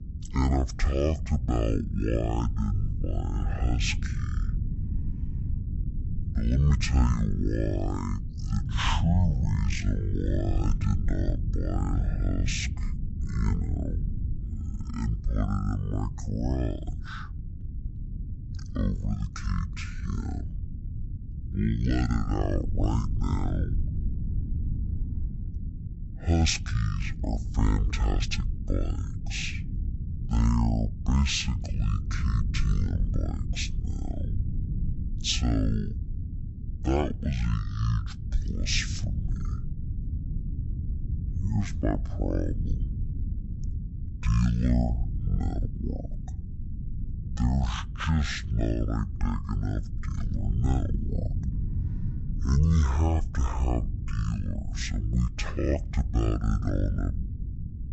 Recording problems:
wrong speed and pitch; too slow and too low; 0.5 times normal speed
low rumble; noticeable; throughout; 15 dB below the speech

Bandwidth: 8 kHz